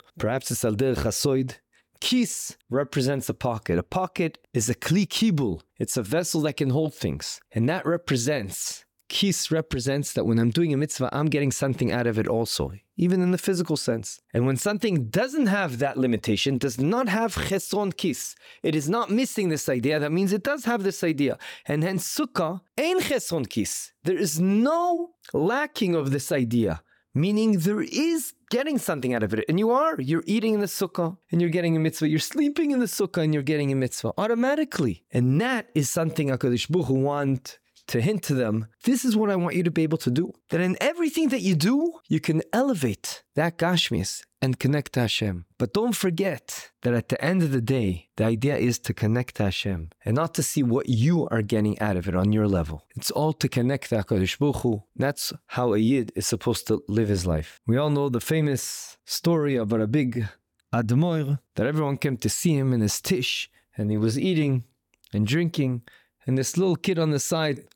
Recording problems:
none

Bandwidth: 17.5 kHz